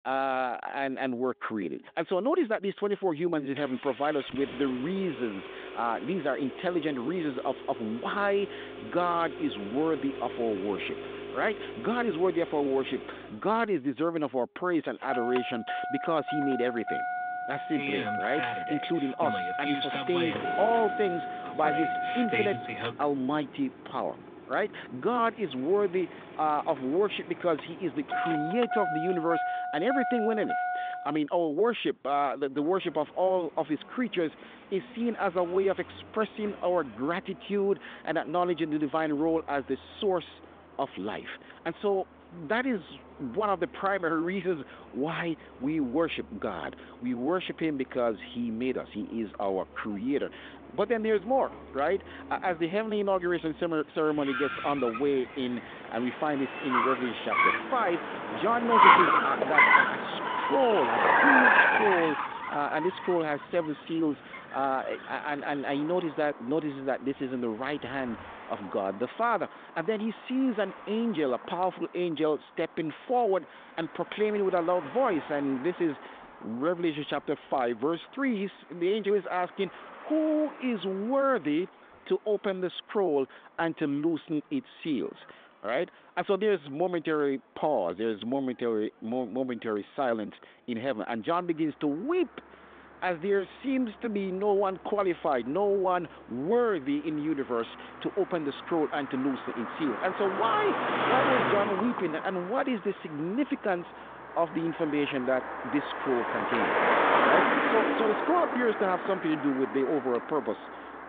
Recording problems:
phone-call audio; nothing above 3.5 kHz
traffic noise; very loud; throughout; 1 dB above the speech

